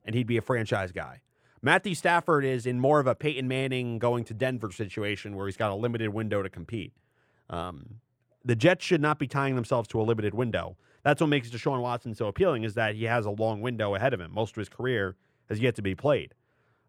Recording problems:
muffled; slightly; fading above 3 kHz

